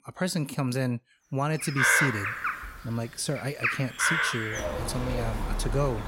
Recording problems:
animal sounds; very loud; from 1.5 s on; 3 dB above the speech

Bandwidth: 16 kHz